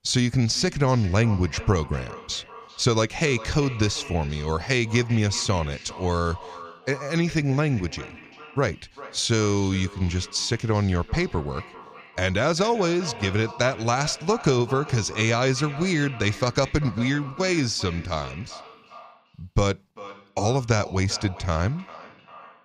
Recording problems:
echo of what is said; noticeable; throughout; 390 ms later, 15 dB below the speech

